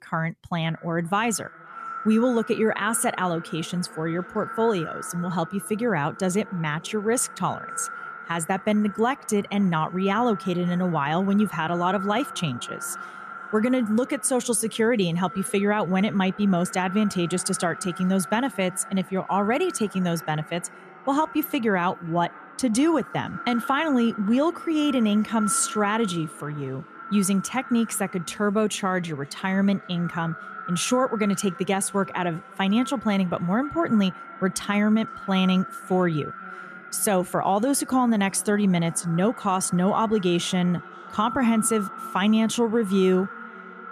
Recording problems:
echo of what is said; noticeable; throughout; 520 ms later, 15 dB below the speech

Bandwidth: 14.5 kHz